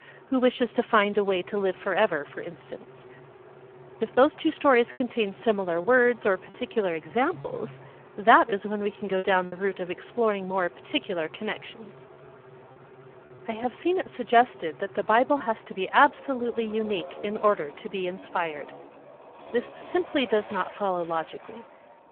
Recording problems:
phone-call audio; poor line
traffic noise; faint; throughout; 20 dB below the speech
choppy; occasionally; 2% of the speech affected

